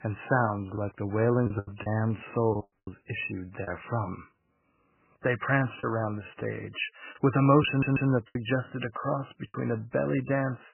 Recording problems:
garbled, watery; badly; nothing above 3 kHz
choppy; very; from 1 to 2 s, from 2.5 to 3.5 s and from 6 to 9.5 s; 7% of the speech affected
audio cutting out; at 2.5 s
audio stuttering; at 7.5 s

